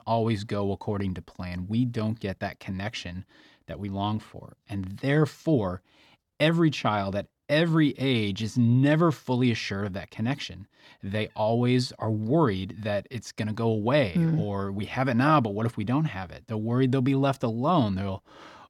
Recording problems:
none

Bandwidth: 18 kHz